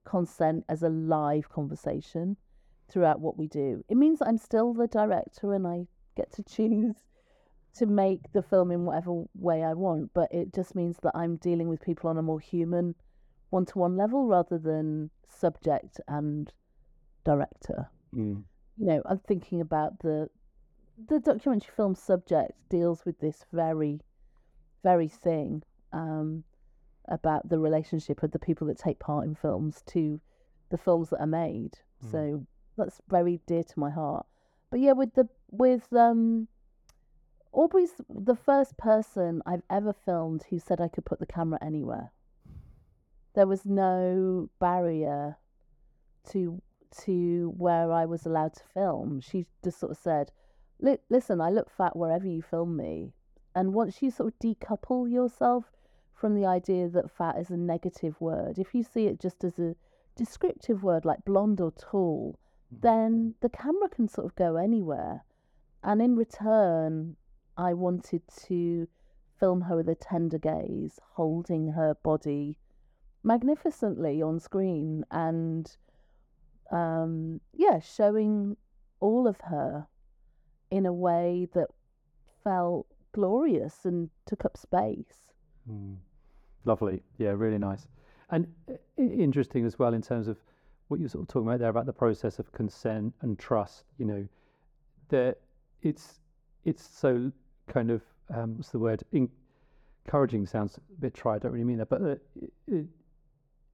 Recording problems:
muffled; very; fading above 1.5 kHz

